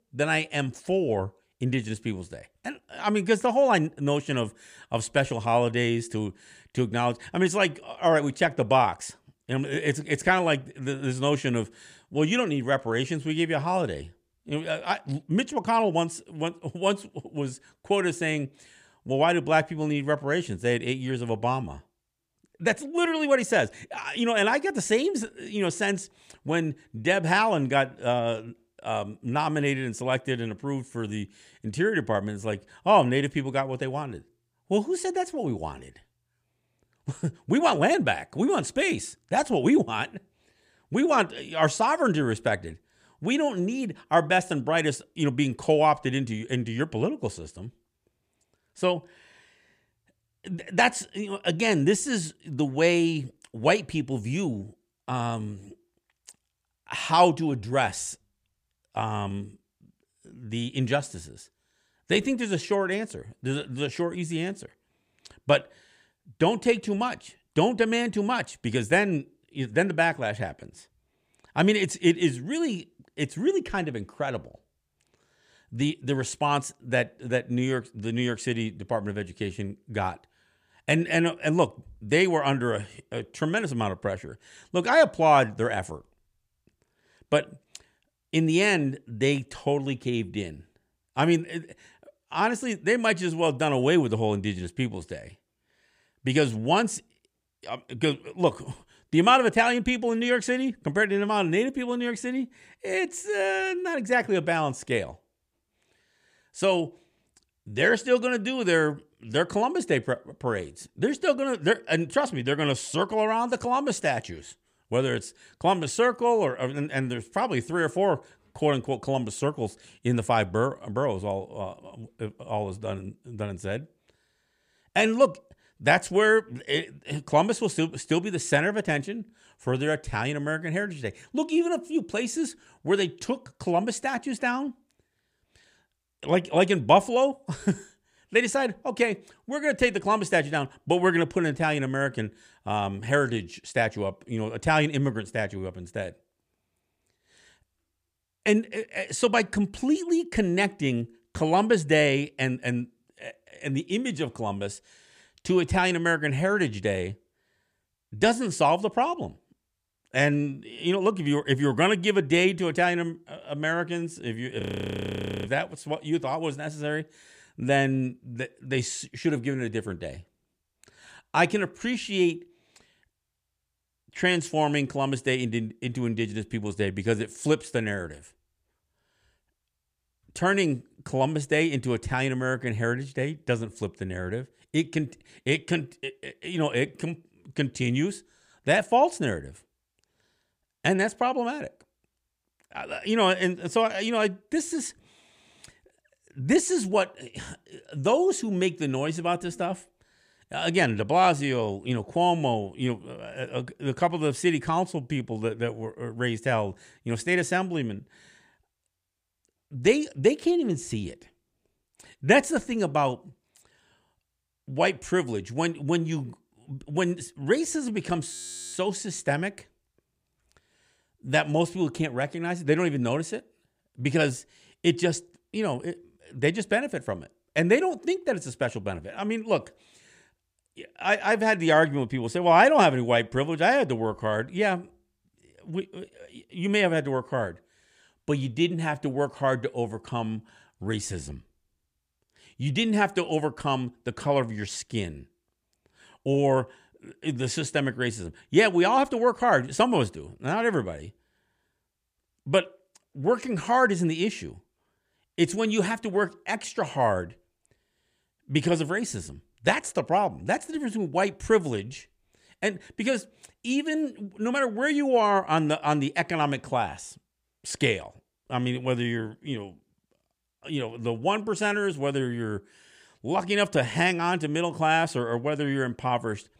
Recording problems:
audio freezing; at 2:45 for 1 s and at 3:38

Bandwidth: 14.5 kHz